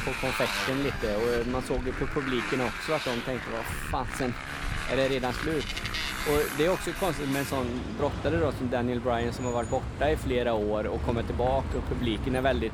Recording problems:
traffic noise; loud; throughout; 4 dB below the speech

